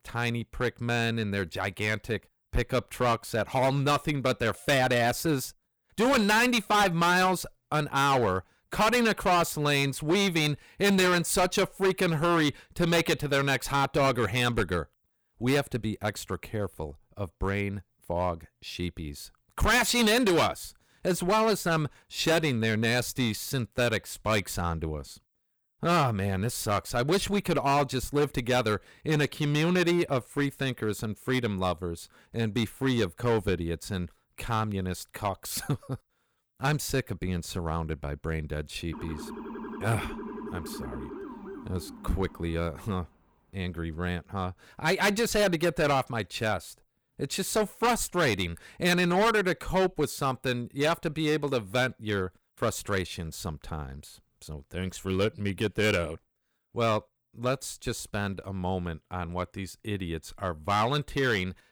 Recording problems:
distortion; heavy; 7% of the sound clipped
siren; faint; from 39 to 43 s; peak 10 dB below the speech

